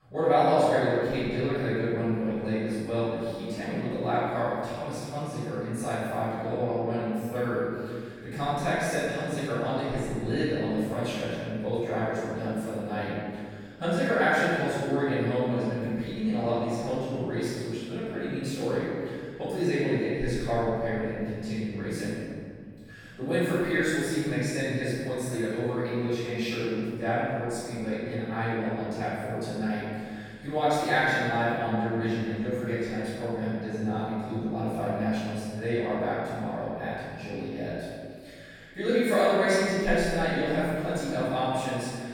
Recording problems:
room echo; strong; dies away in 1.9 s
off-mic speech; far

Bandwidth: 17.5 kHz